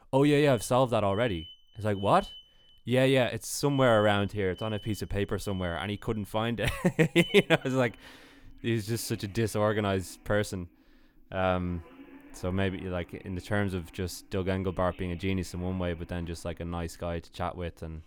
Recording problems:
alarms or sirens; noticeable; throughout; 20 dB below the speech

